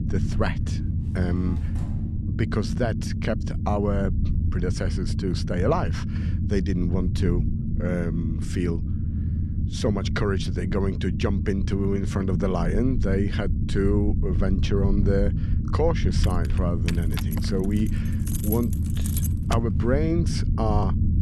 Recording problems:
low rumble; loud; throughout; 8 dB below the speech
door banging; faint; from 1 to 2 s; peak 15 dB below the speech
jangling keys; noticeable; from 16 to 20 s; peak 5 dB below the speech

